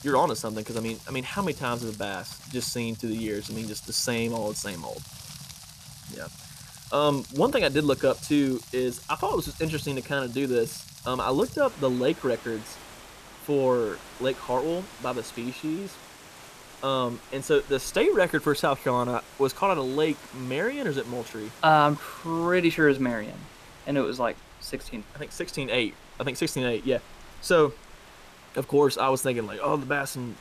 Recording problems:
rain or running water; noticeable; throughout; 15 dB below the speech

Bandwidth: 14.5 kHz